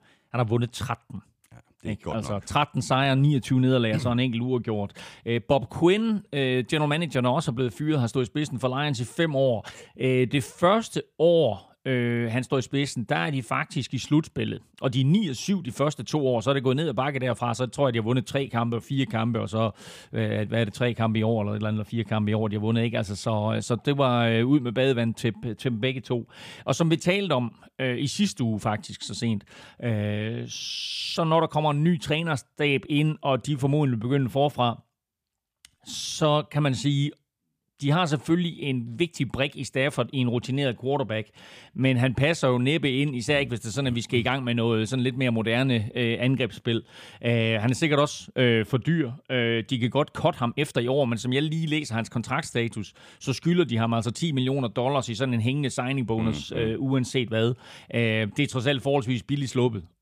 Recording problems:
uneven, jittery; strongly; from 9.5 to 51 s

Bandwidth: 15 kHz